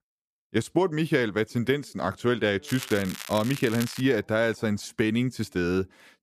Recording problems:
crackling; noticeable; from 2.5 to 4 s; 10 dB below the speech

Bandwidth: 14.5 kHz